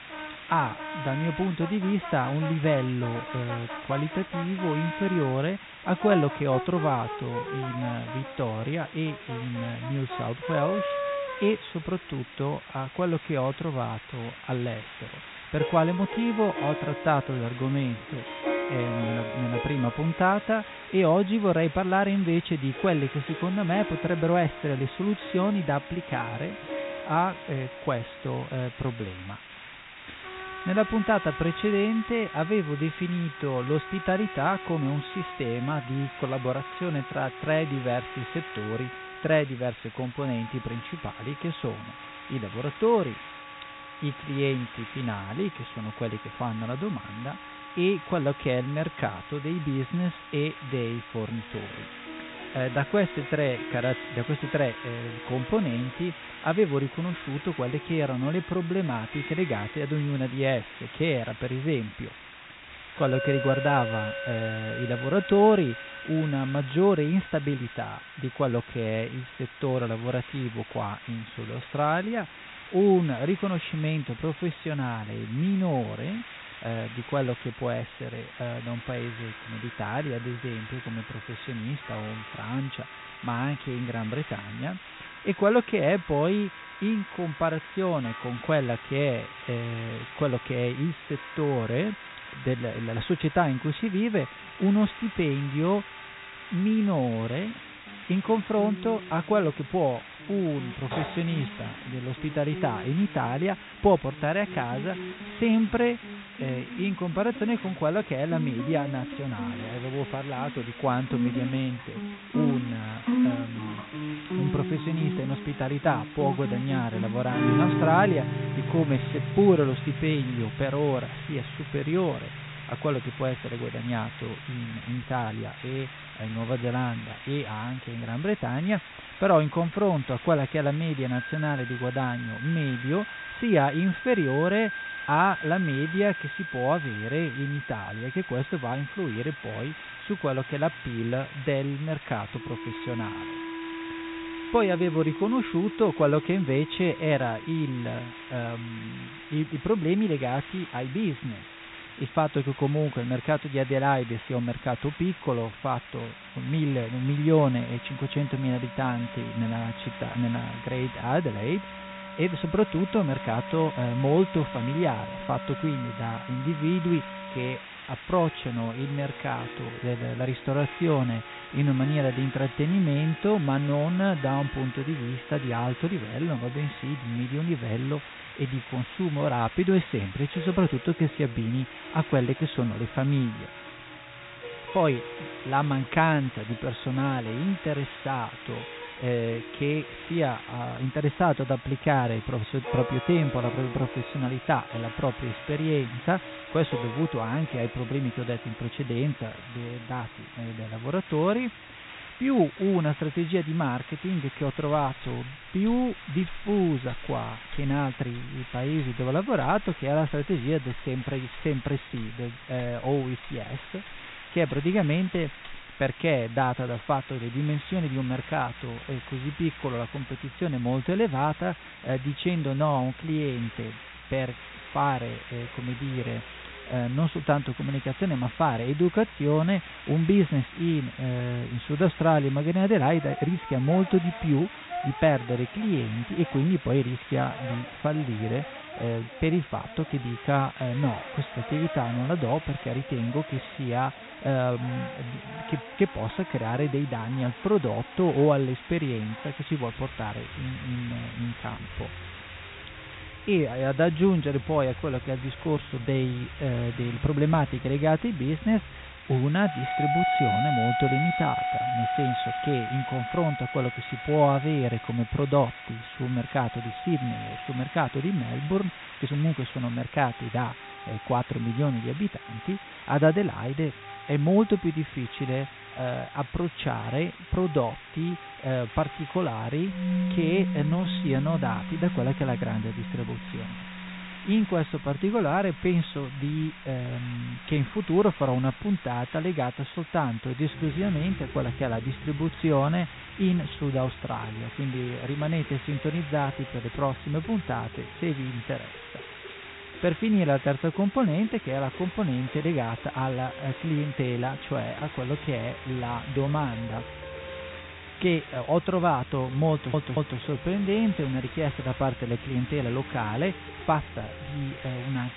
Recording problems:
high frequencies cut off; severe; nothing above 4 kHz
background music; noticeable; throughout; 10 dB below the speech
hiss; noticeable; throughout; 15 dB below the speech
audio stuttering; at 5:10

